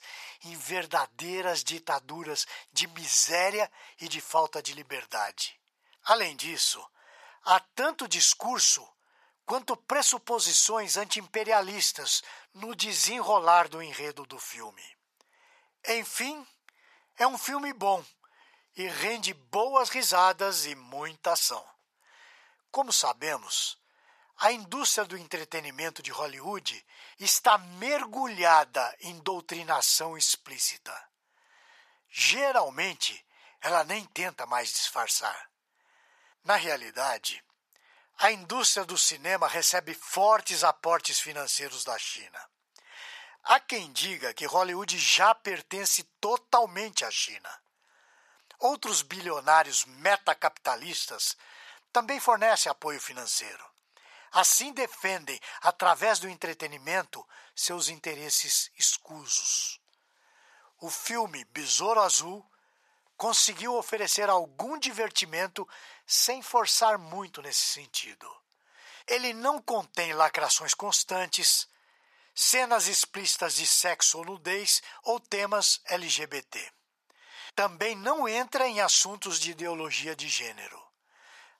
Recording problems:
thin; very; fading below 850 Hz

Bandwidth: 14 kHz